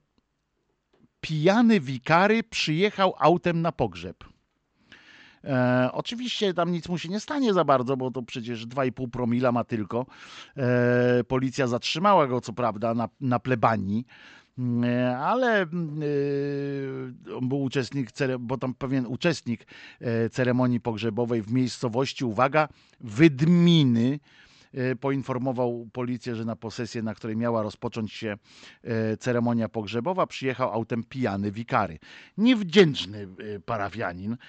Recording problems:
high frequencies cut off; noticeable; nothing above 8 kHz

